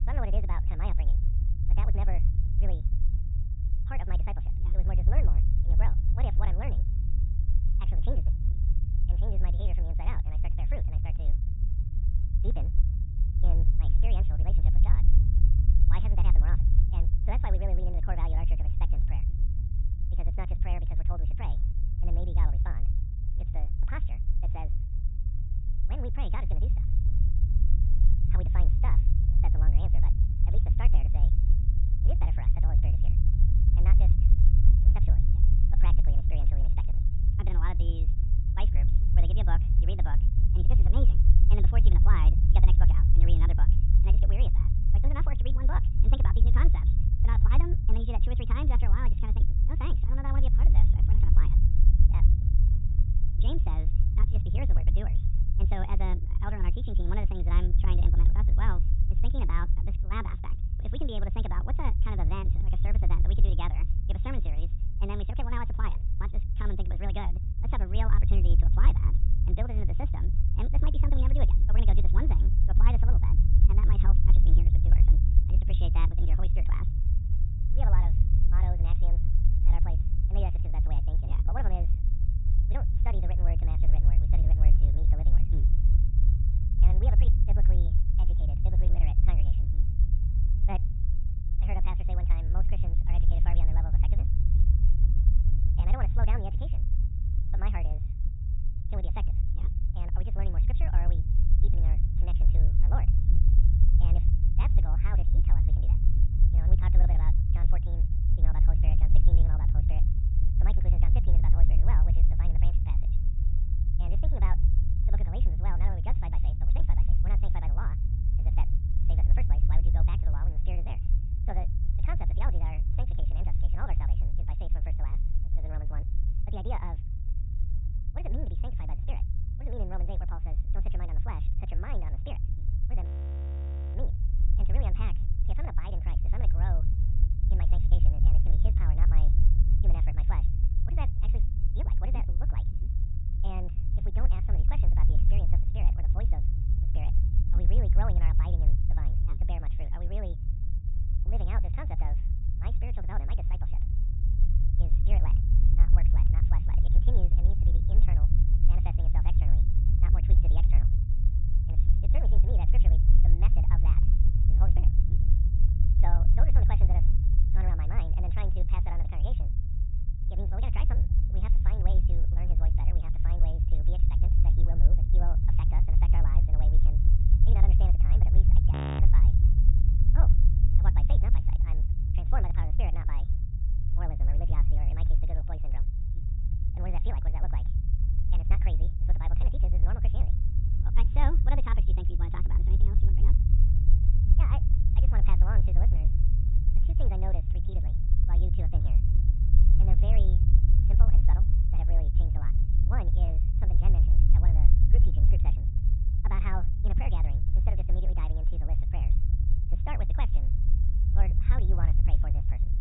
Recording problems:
high frequencies cut off; severe; nothing above 4 kHz
wrong speed and pitch; too fast and too high; 1.6 times normal speed
low rumble; loud; throughout; 3 dB below the speech
audio freezing; at 2:13 for 1 s and at 2:59

